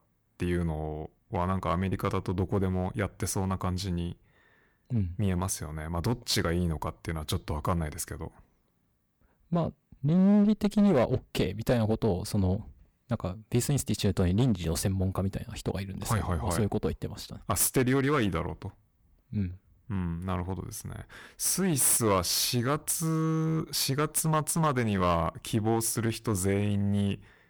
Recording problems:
distortion; slight; 6% of the sound clipped

